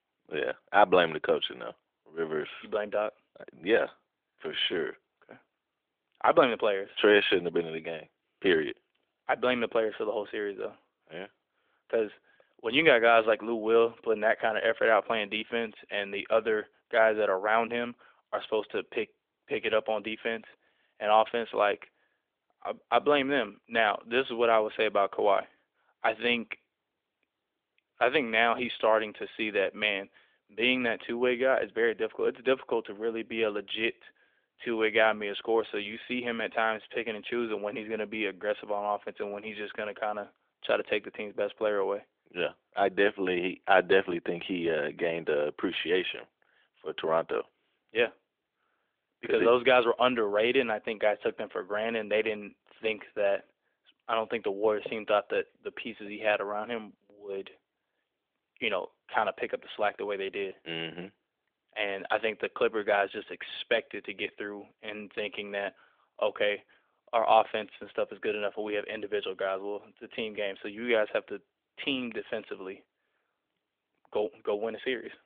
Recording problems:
phone-call audio; nothing above 3.5 kHz

